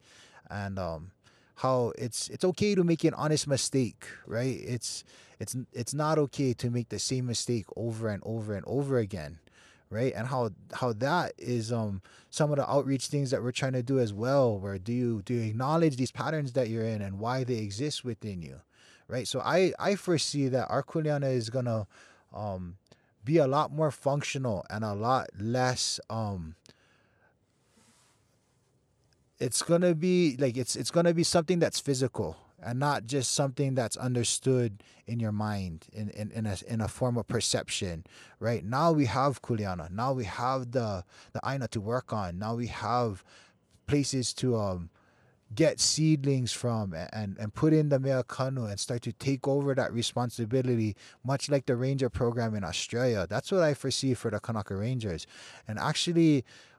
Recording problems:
uneven, jittery; strongly; from 2.5 to 56 s

